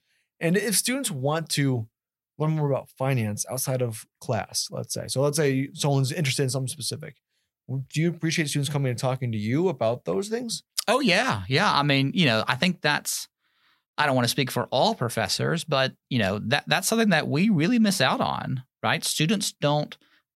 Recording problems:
none

